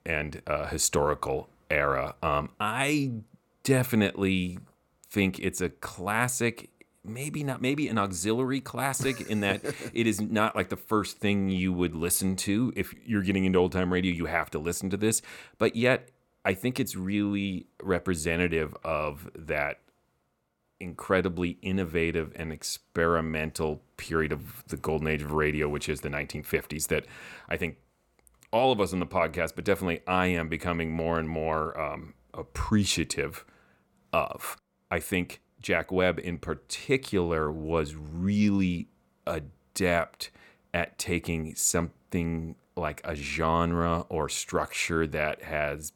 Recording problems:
none

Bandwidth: 18.5 kHz